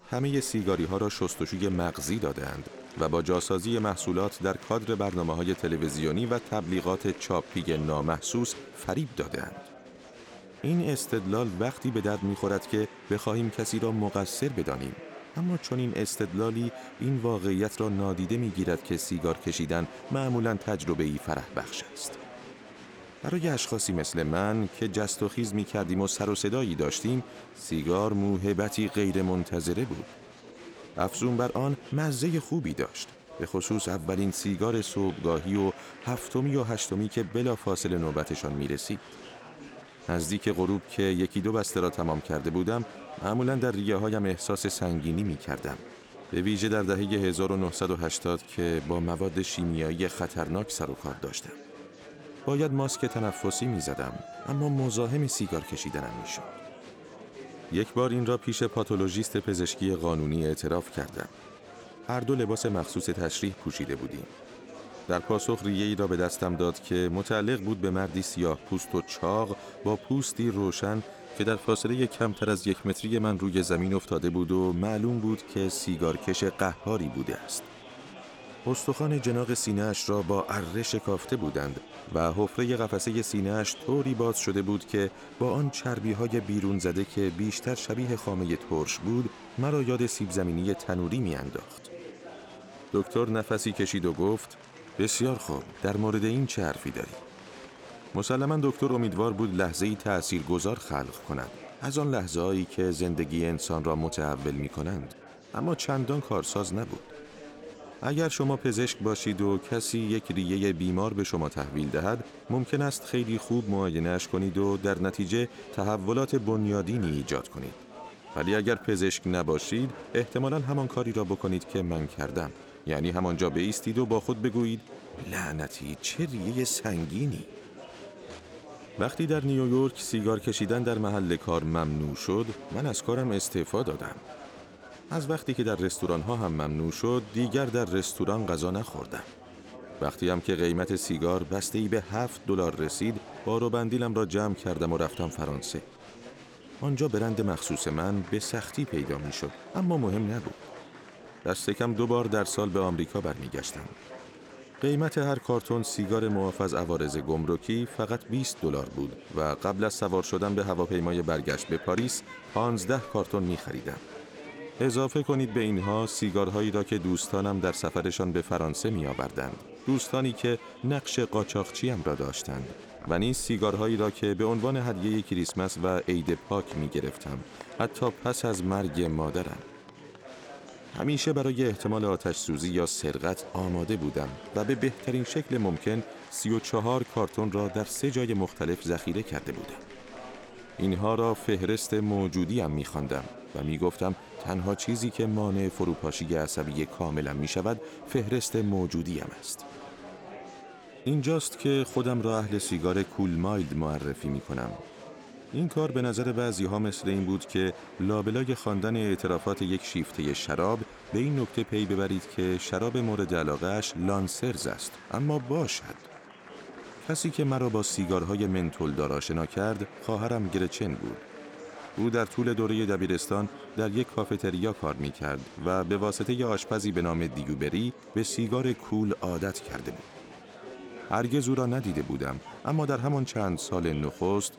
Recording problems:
murmuring crowd; noticeable; throughout; 15 dB below the speech

